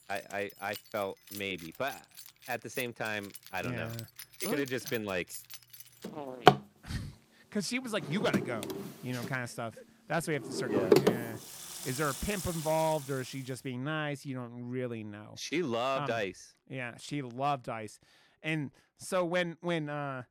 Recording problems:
household noises; very loud; until 13 s; 2 dB above the speech

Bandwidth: 18.5 kHz